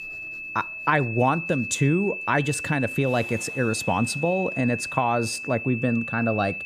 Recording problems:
high-pitched whine; loud; throughout; 2.5 kHz, 6 dB below the speech
household noises; faint; throughout; 30 dB below the speech

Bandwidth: 14.5 kHz